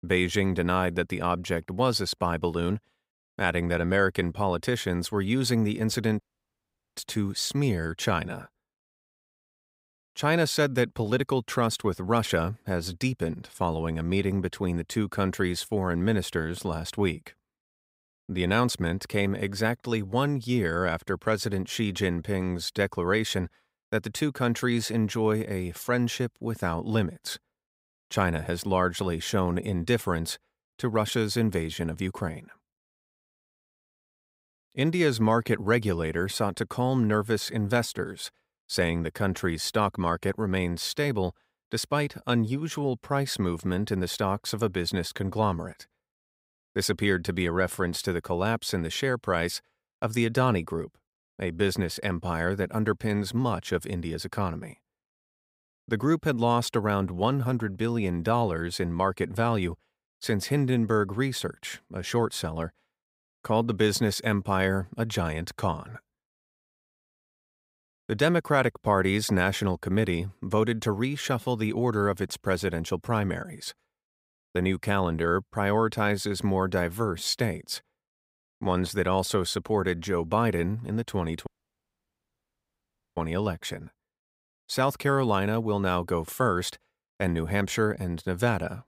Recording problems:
audio cutting out; at 6 s for 1 s and at 1:21 for 1.5 s

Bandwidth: 15.5 kHz